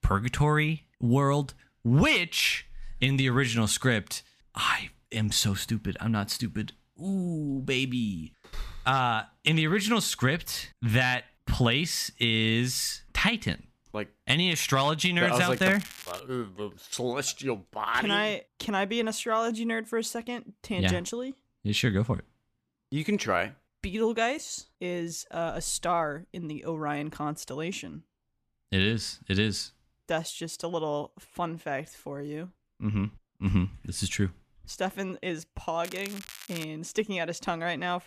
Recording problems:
crackling; noticeable; at 15 s and at 36 s; 15 dB below the speech

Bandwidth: 14.5 kHz